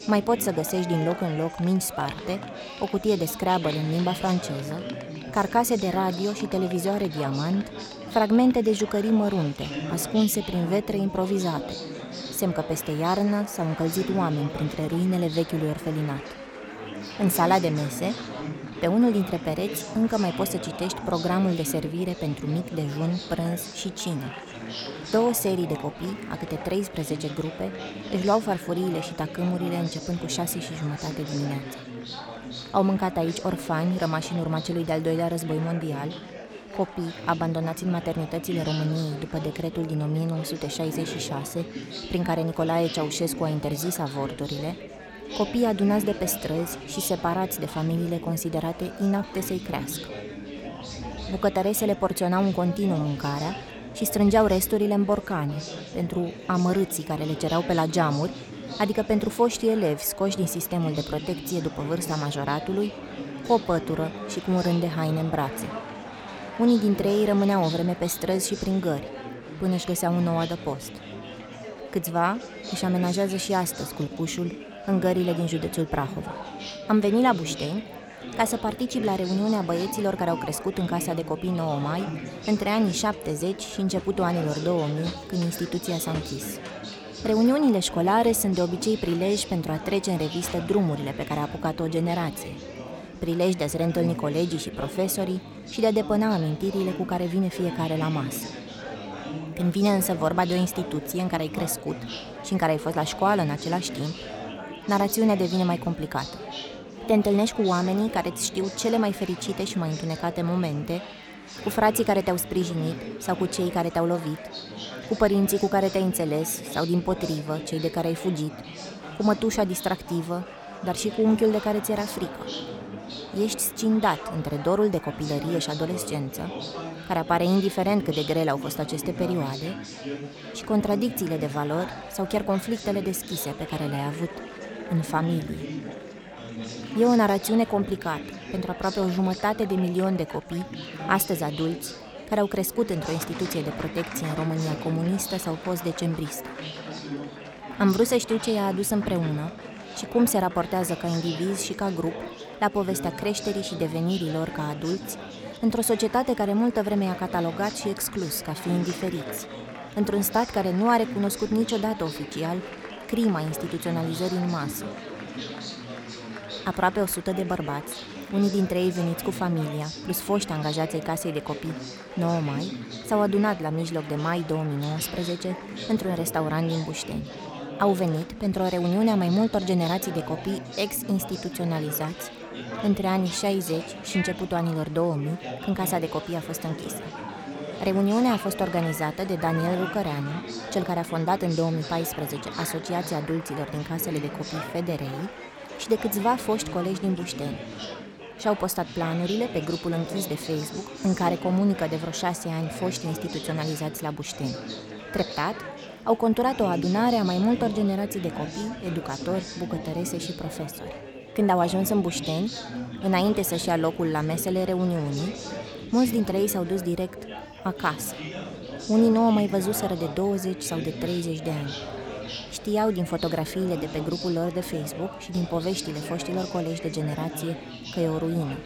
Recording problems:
chatter from many people; noticeable; throughout; 10 dB below the speech

